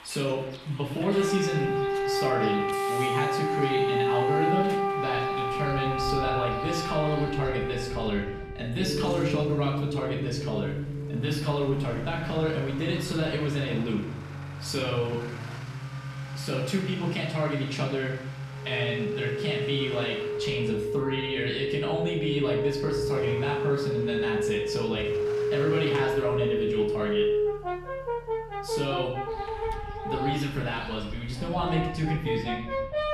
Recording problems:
off-mic speech; far
room echo; noticeable; dies away in 0.6 s
background music; loud; throughout; as loud as the speech
traffic noise; noticeable; throughout; 10 dB below the speech

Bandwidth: 13.5 kHz